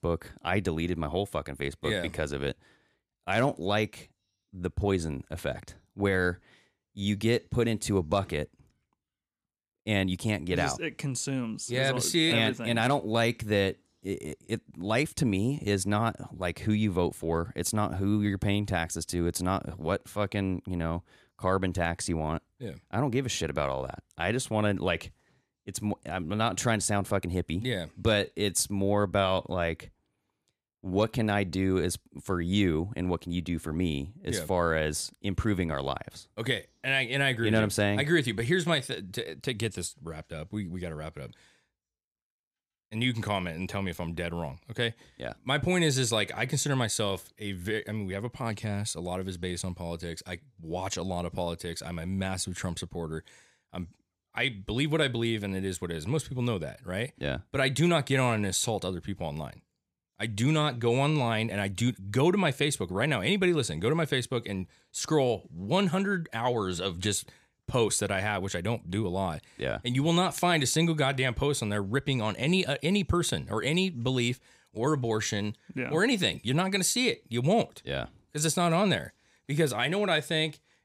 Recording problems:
none

